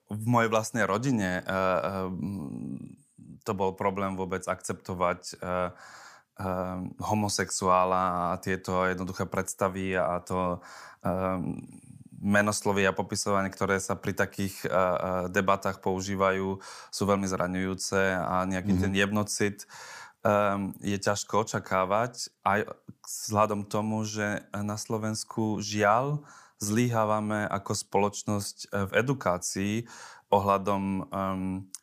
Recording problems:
none

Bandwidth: 15 kHz